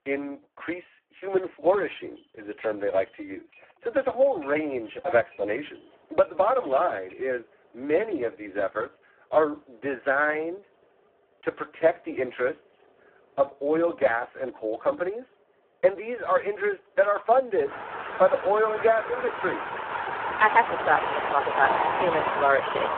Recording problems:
phone-call audio; poor line
traffic noise; loud; throughout; 4 dB below the speech

